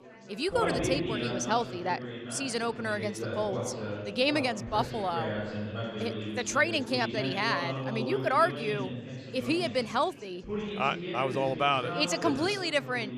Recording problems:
chatter from many people; loud; throughout; 6 dB below the speech

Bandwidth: 14.5 kHz